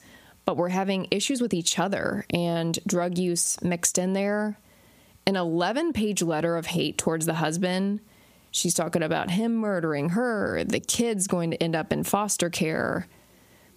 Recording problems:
squashed, flat; heavily

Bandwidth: 15 kHz